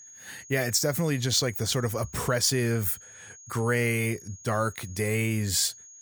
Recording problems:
high-pitched whine; noticeable; throughout; 6.5 kHz, 20 dB below the speech

